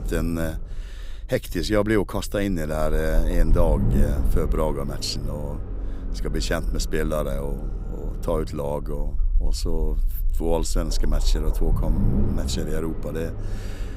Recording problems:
low rumble; noticeable; throughout; 10 dB below the speech

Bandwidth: 15.5 kHz